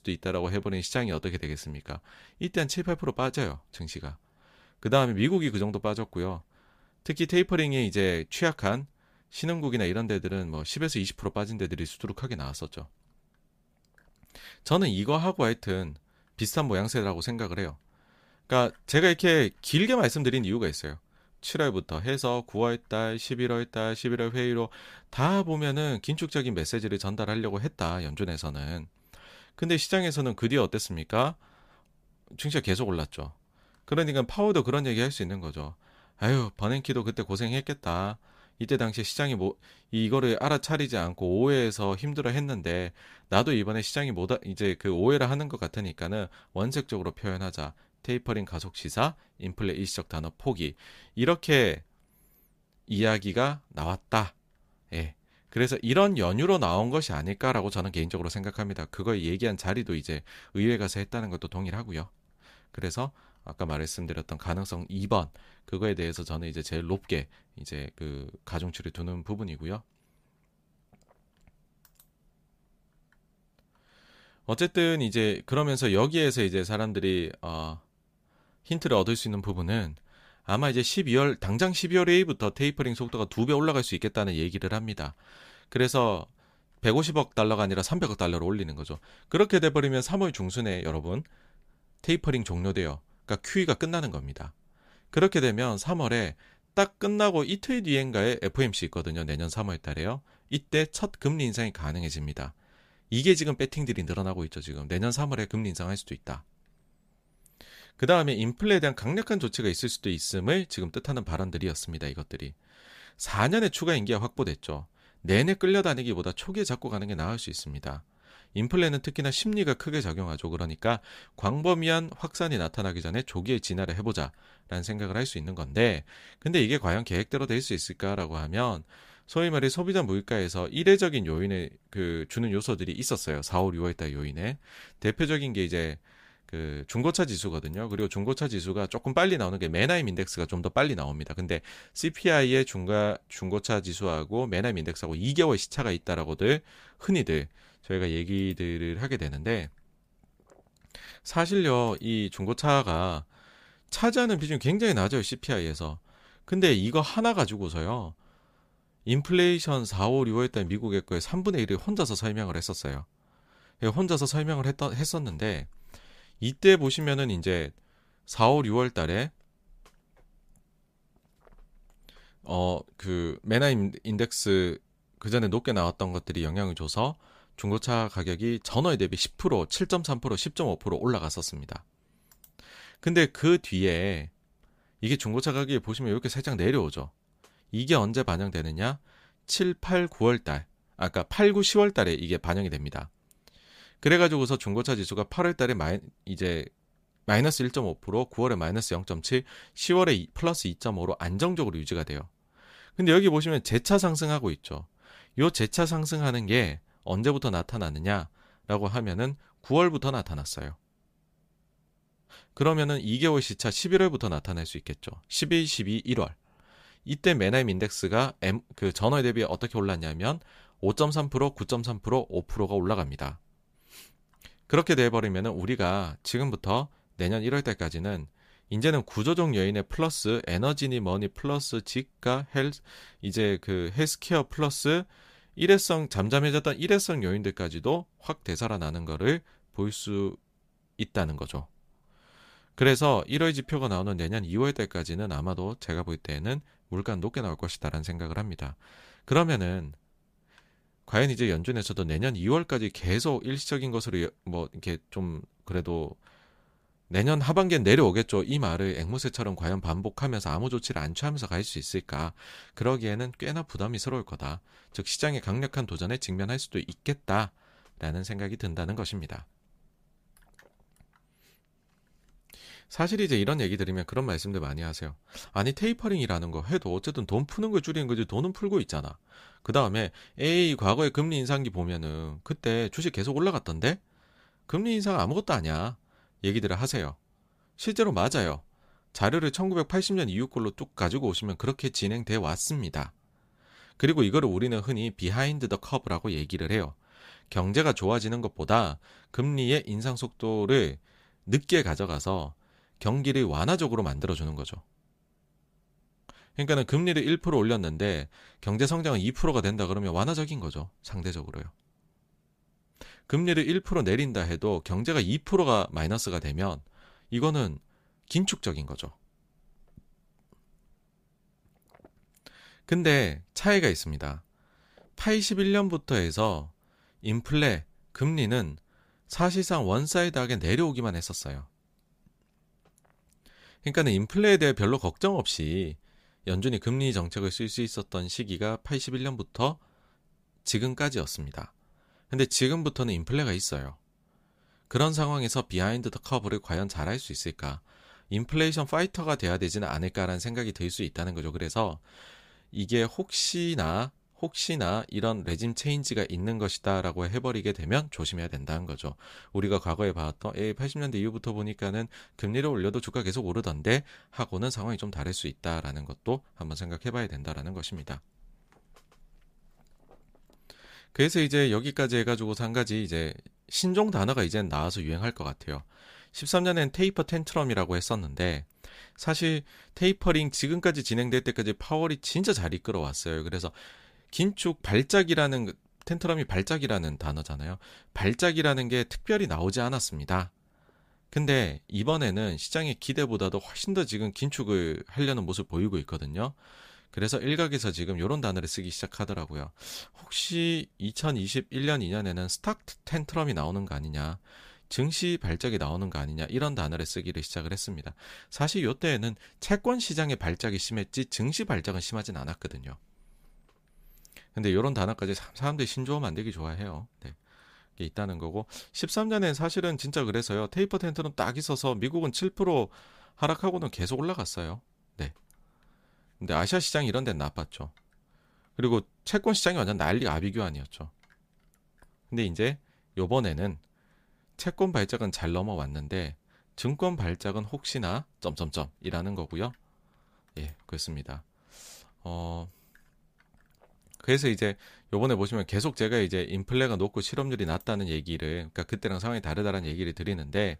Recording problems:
none

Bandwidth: 15 kHz